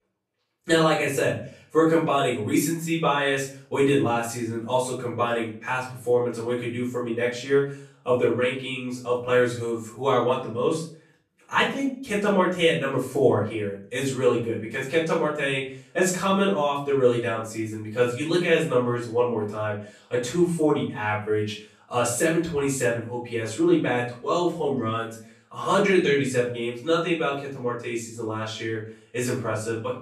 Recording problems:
off-mic speech; far
room echo; noticeable; dies away in 0.4 s

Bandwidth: 14 kHz